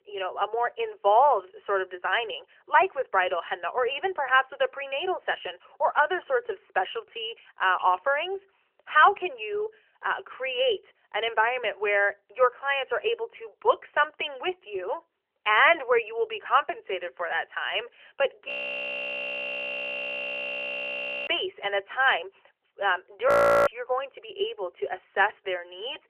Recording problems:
phone-call audio; nothing above 3 kHz
audio freezing; at 18 s for 3 s and at 23 s

